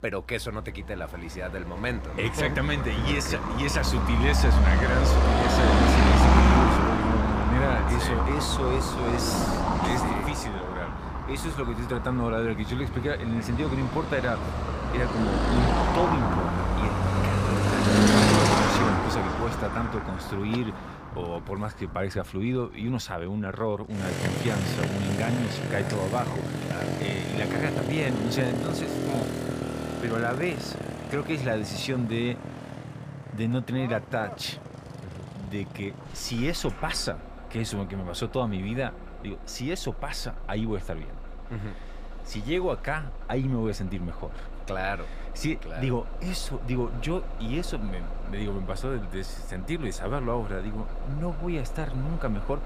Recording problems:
traffic noise; very loud; throughout; 4 dB above the speech

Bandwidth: 15 kHz